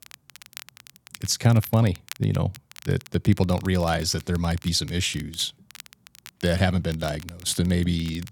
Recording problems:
crackle, like an old record; noticeable; 20 dB below the speech

